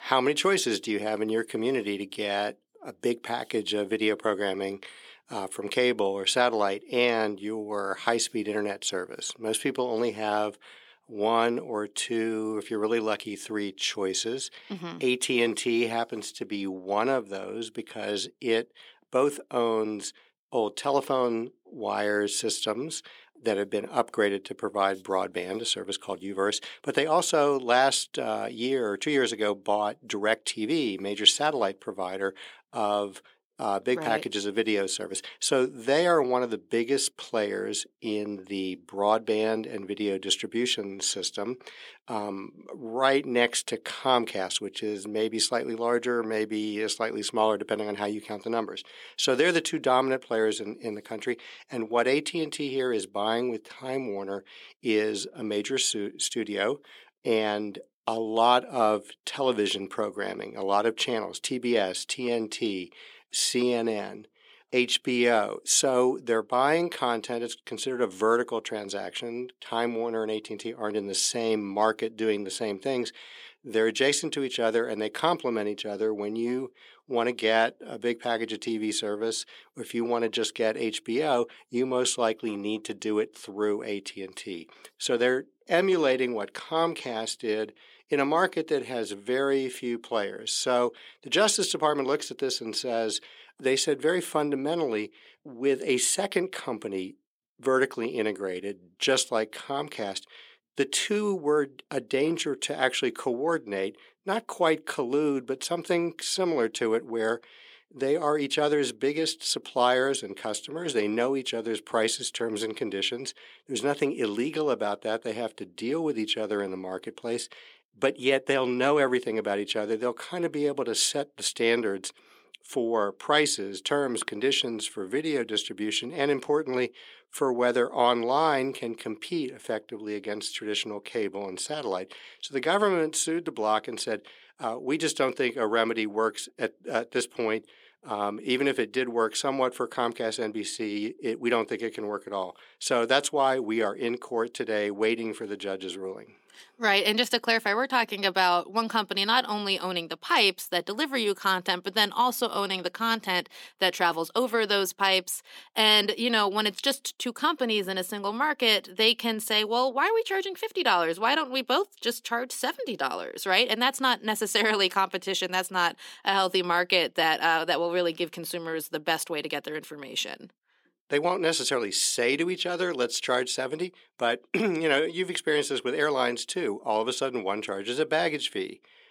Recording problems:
thin; somewhat; fading below 300 Hz

